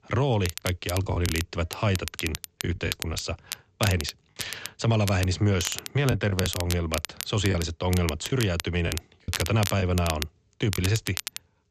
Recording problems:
high frequencies cut off; noticeable; nothing above 8 kHz
crackle, like an old record; loud; 8 dB below the speech
choppy; occasionally; 5% of the speech affected

